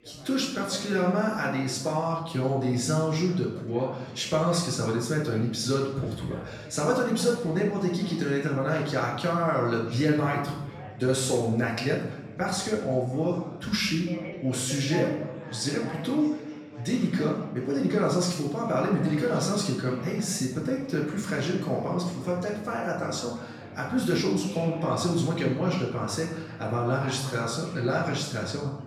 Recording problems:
off-mic speech; far
room echo; noticeable; dies away in 0.8 s
chatter from many people; noticeable; throughout; 15 dB below the speech

